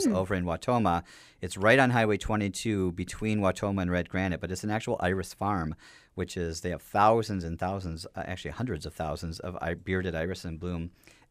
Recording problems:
abrupt cut into speech; at the start

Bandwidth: 15 kHz